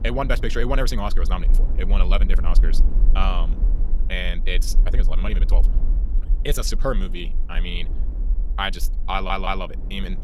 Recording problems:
wrong speed, natural pitch; too fast; 1.6 times normal speed
wind noise on the microphone; occasional gusts; 20 dB below the speech
low rumble; faint; throughout; 20 dB below the speech
audio stuttering; at 9 s

